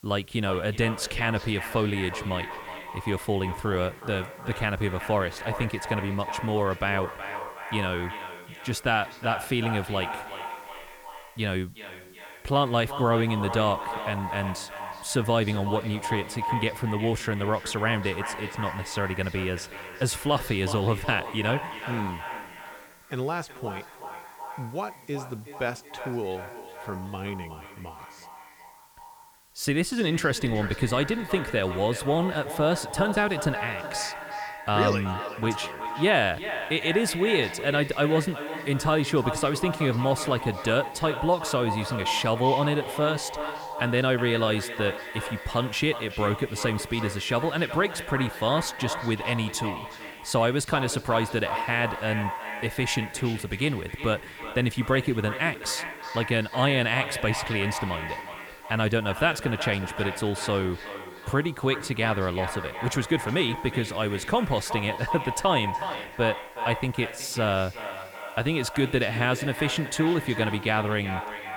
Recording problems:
echo of what is said; strong; throughout; 370 ms later, 8 dB below the speech
hiss; faint; throughout; 25 dB below the speech

